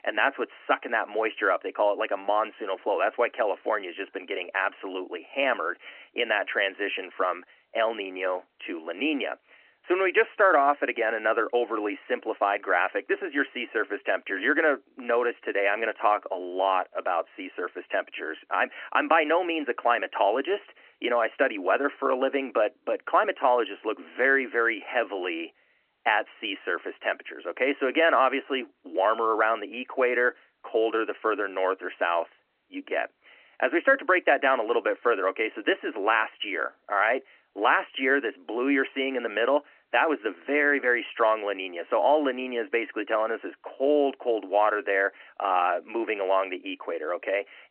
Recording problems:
phone-call audio

